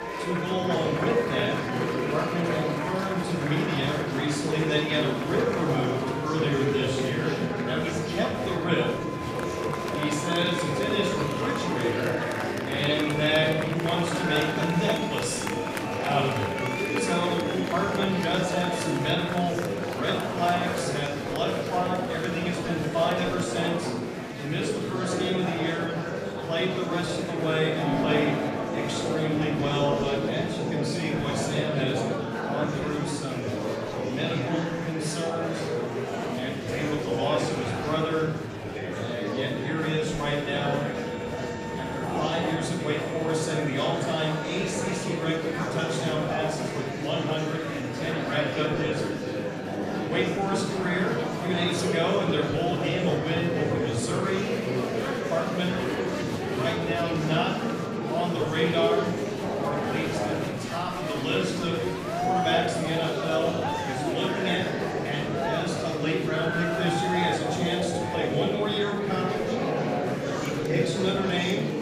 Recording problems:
off-mic speech; far
room echo; noticeable; dies away in 0.7 s
murmuring crowd; loud; throughout; 1 dB below the speech
background music; noticeable; until 52 s; 10 dB below the speech

